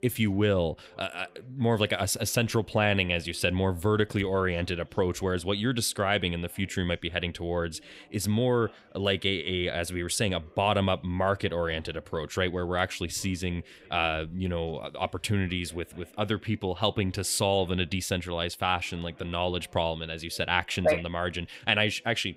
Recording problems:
chatter from many people; faint; throughout; 30 dB below the speech

